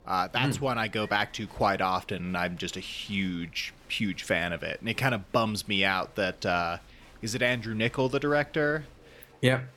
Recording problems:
crowd noise; faint; throughout; 25 dB below the speech

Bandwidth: 17.5 kHz